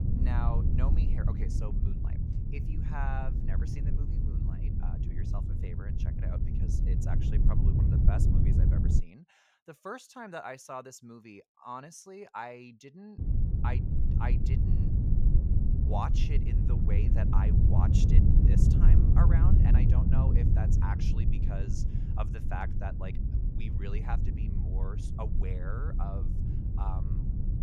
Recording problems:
low rumble; loud; until 9 s and from 13 s on; as loud as the speech

